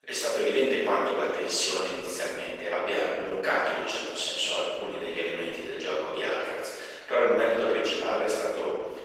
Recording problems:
room echo; strong; dies away in 1.6 s
off-mic speech; far
thin; very; fading below 400 Hz
garbled, watery; slightly; nothing above 16 kHz

